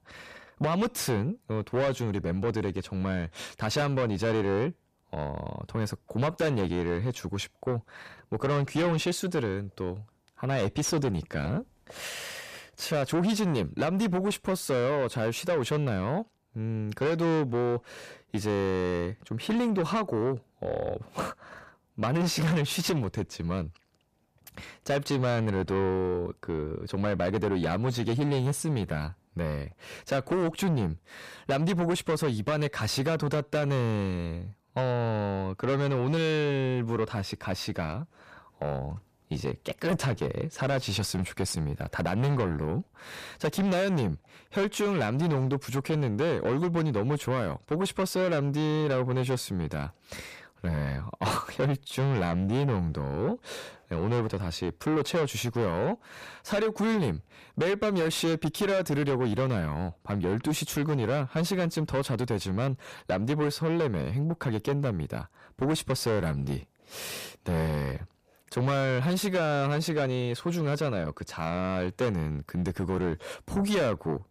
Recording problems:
distortion; heavy; 7 dB below the speech

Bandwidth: 14.5 kHz